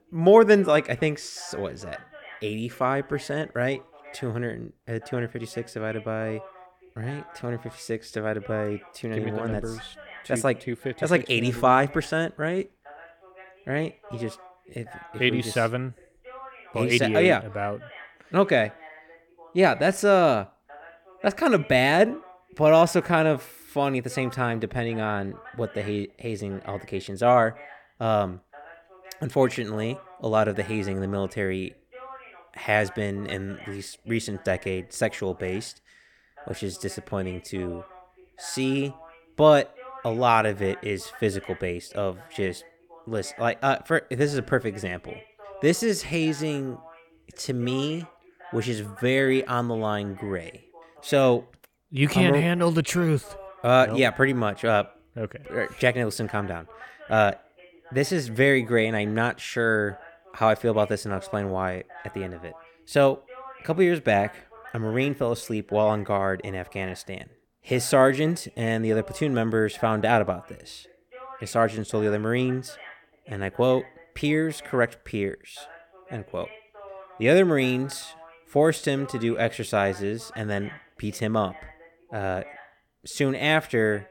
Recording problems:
voice in the background; faint; throughout; 20 dB below the speech

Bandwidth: 18 kHz